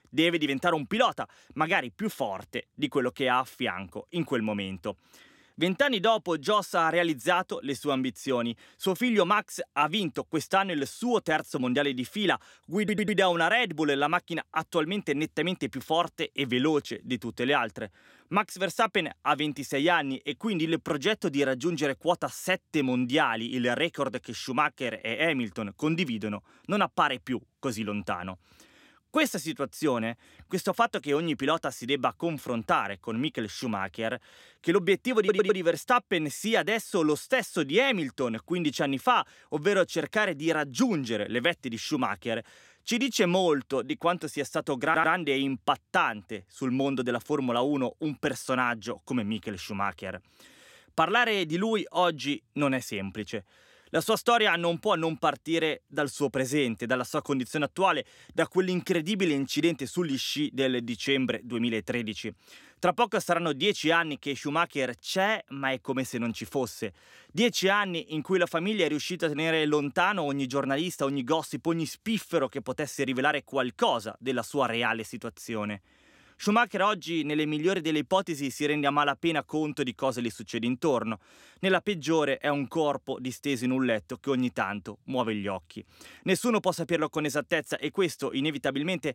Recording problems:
audio stuttering; at 13 s, at 35 s and at 45 s

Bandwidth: 16 kHz